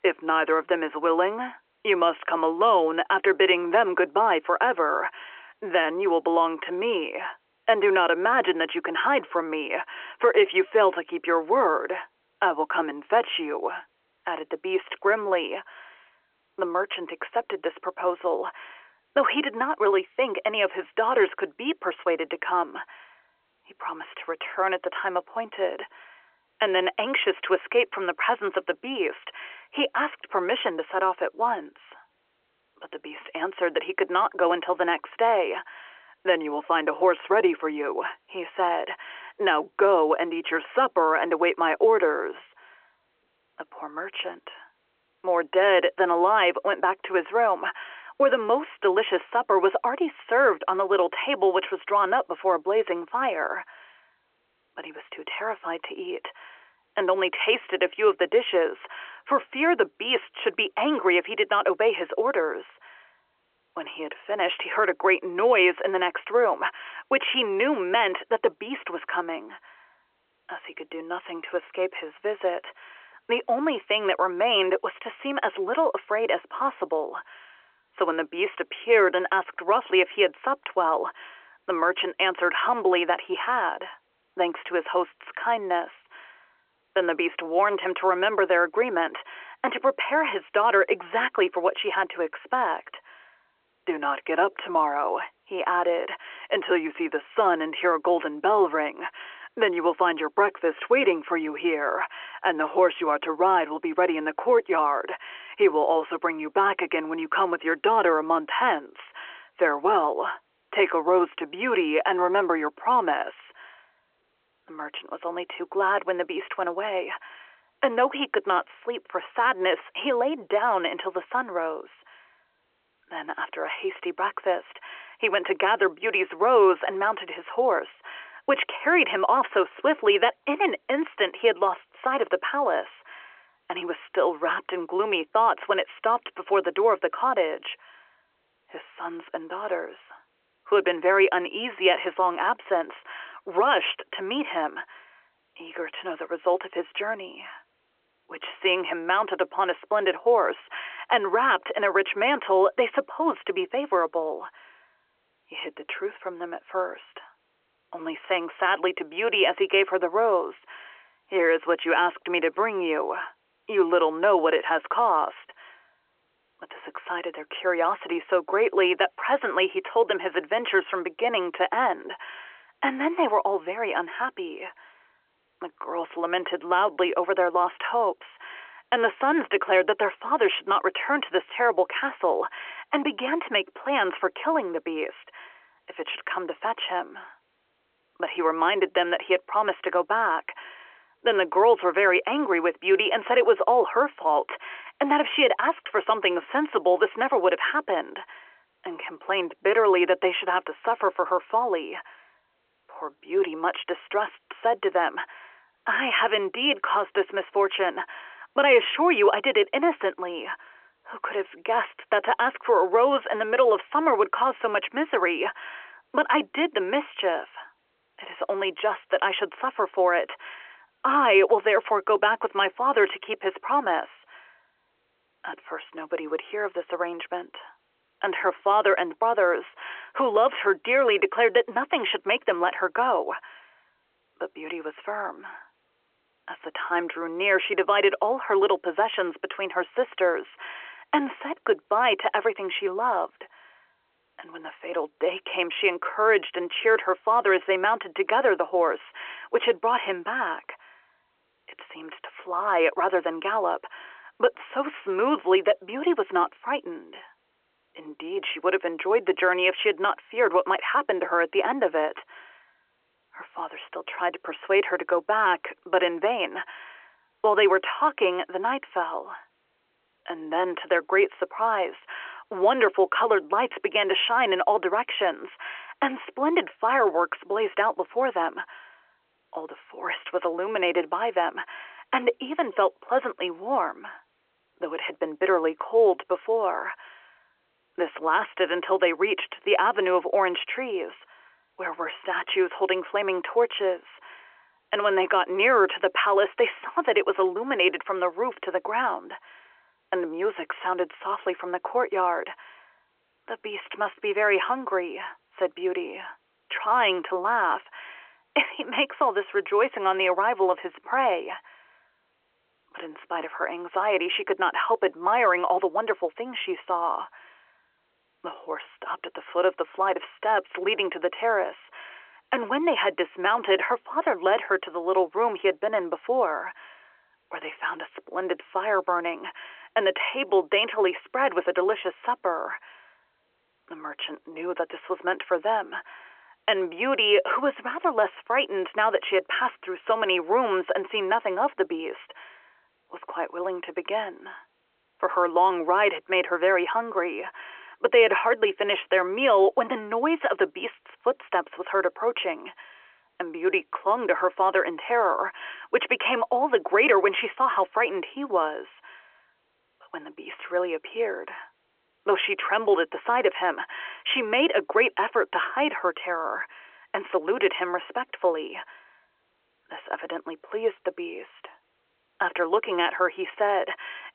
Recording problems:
phone-call audio; nothing above 3 kHz

